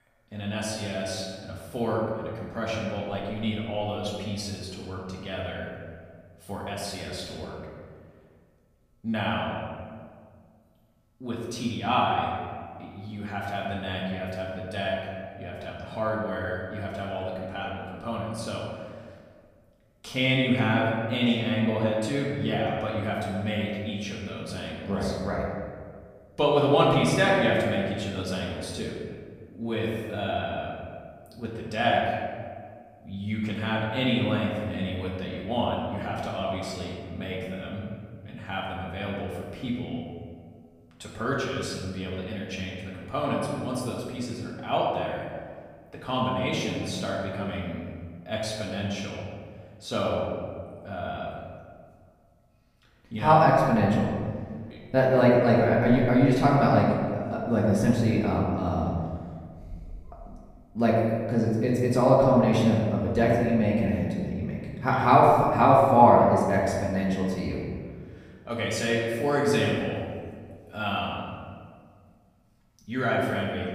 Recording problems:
off-mic speech; far
room echo; noticeable; dies away in 1.6 s

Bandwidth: 15 kHz